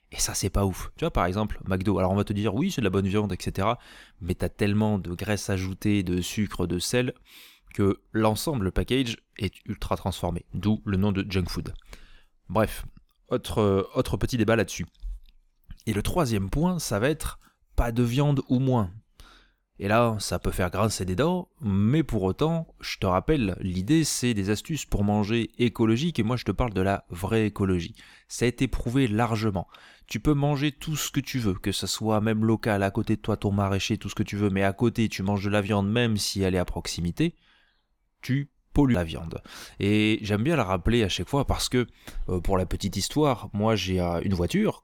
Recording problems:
none

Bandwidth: 18 kHz